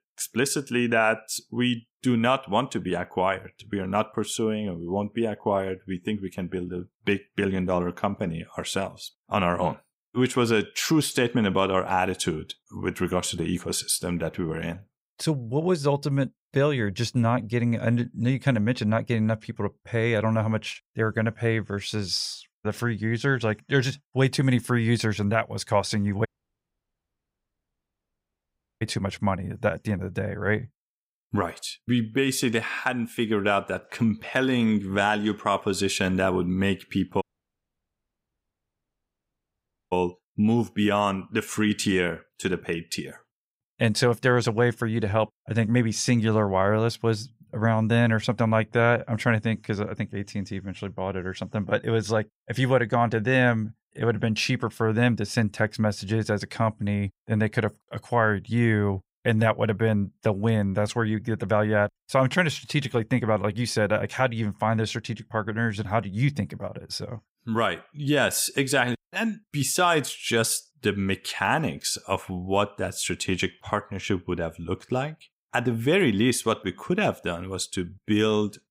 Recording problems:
audio cutting out; at 26 s for 2.5 s and at 37 s for 2.5 s

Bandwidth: 15.5 kHz